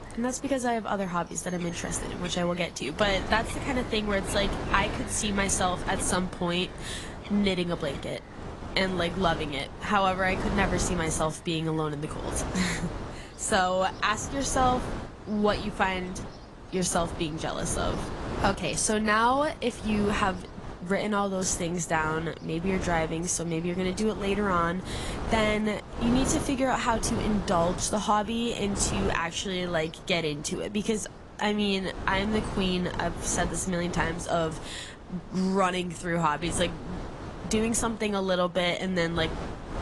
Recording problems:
garbled, watery; slightly; nothing above 10.5 kHz
wind noise on the microphone; occasional gusts; 10 dB below the speech
animal sounds; faint; throughout; 20 dB below the speech

